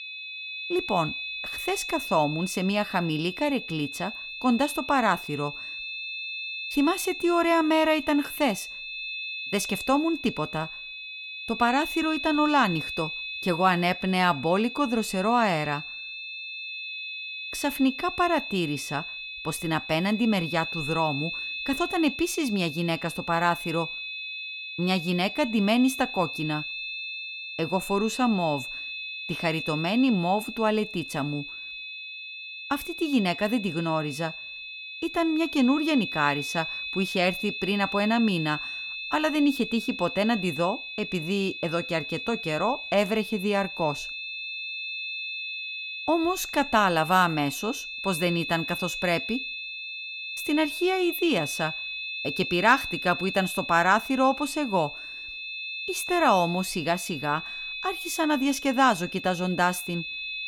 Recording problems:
high-pitched whine; loud; throughout; 2.5 kHz, 7 dB below the speech

